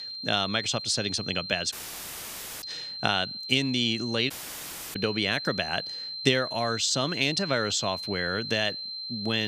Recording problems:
high-pitched whine; loud; throughout; 4 kHz, 7 dB below the speech
audio cutting out; at 1.5 s for 1 s and at 4.5 s for 0.5 s
abrupt cut into speech; at the end

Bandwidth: 15 kHz